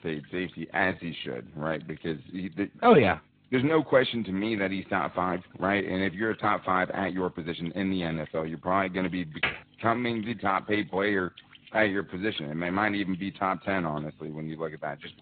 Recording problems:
high frequencies cut off; severe; nothing above 4 kHz
garbled, watery; slightly
electrical hum; faint; throughout; 50 Hz, 25 dB below the speech
uneven, jittery; strongly; from 0.5 to 12 s
keyboard typing; noticeable; at 9.5 s; peak 3 dB below the speech

